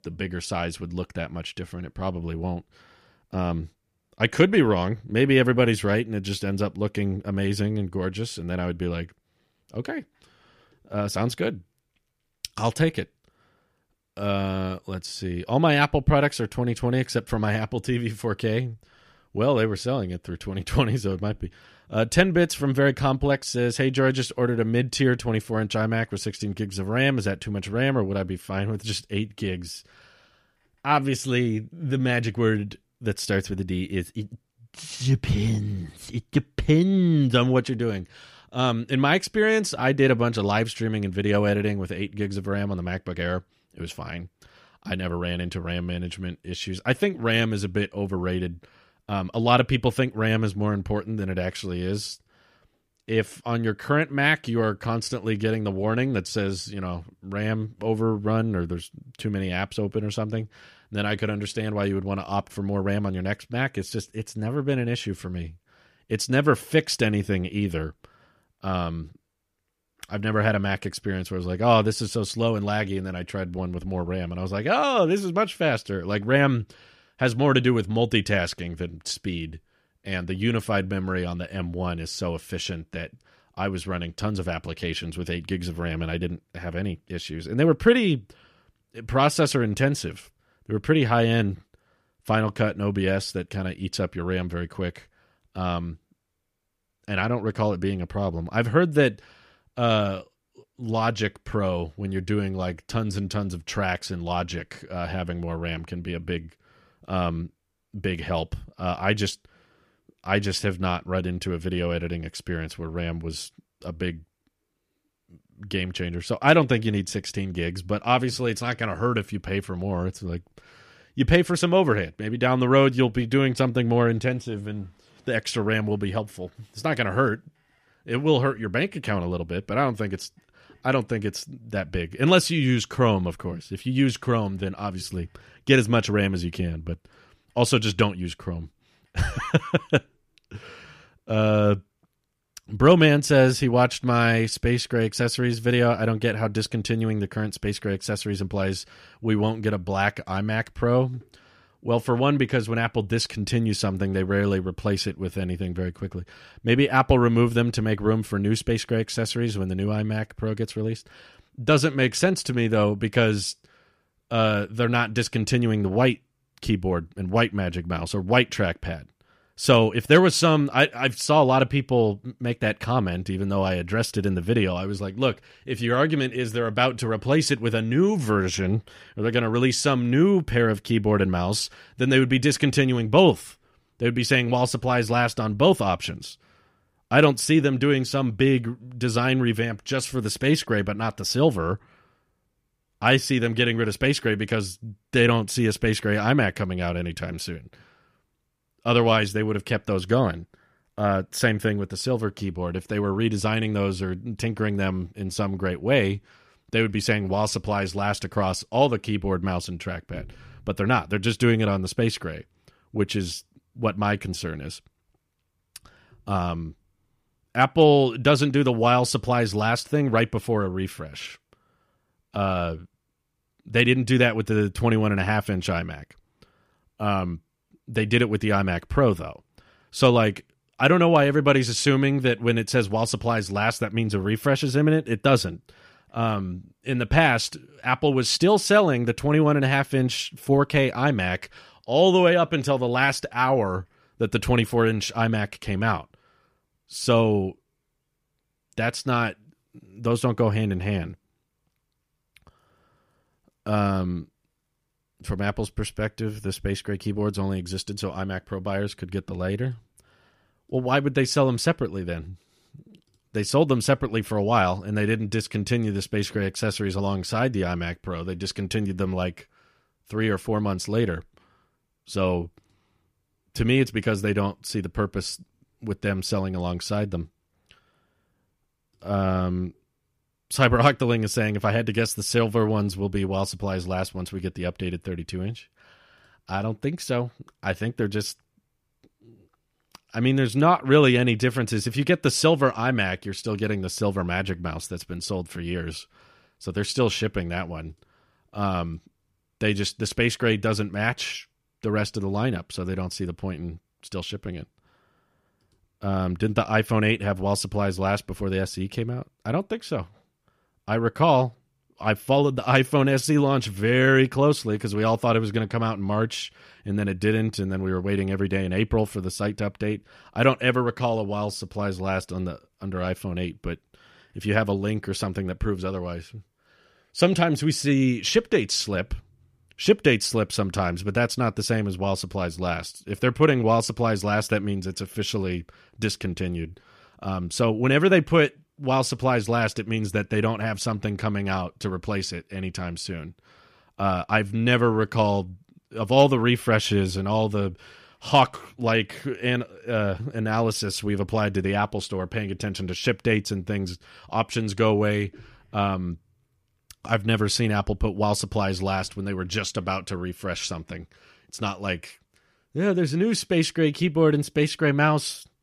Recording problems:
none

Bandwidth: 15 kHz